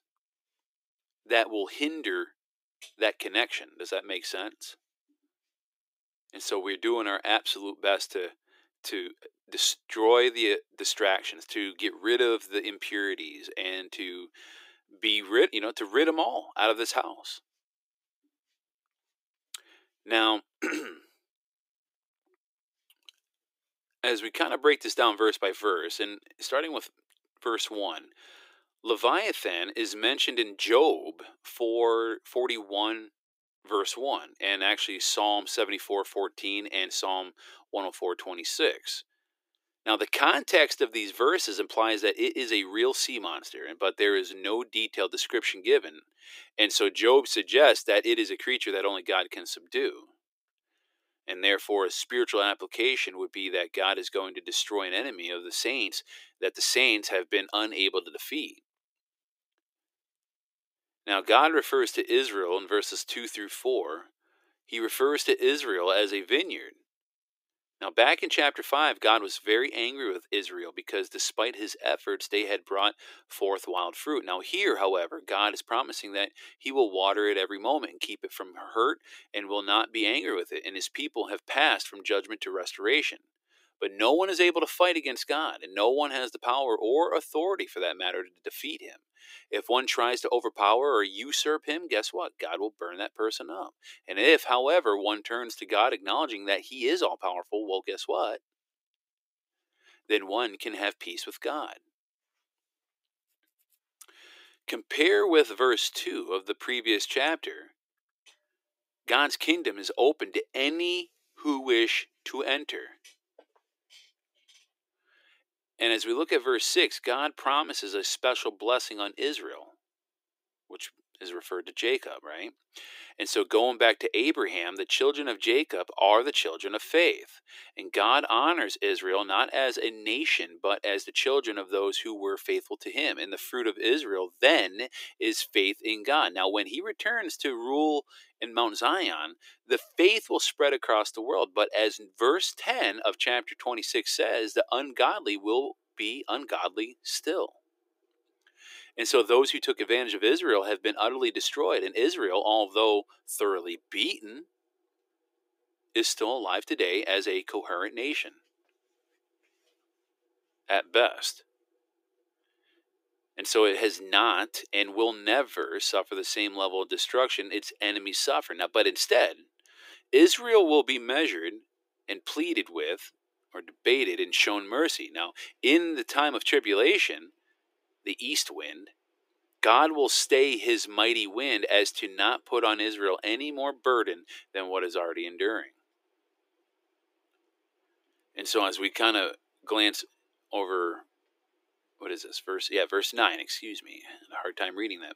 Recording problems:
thin; very; fading below 300 Hz

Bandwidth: 15.5 kHz